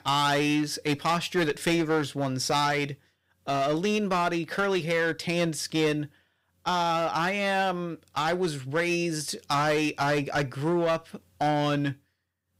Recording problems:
distortion; slight; 7% of the sound clipped

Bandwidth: 15.5 kHz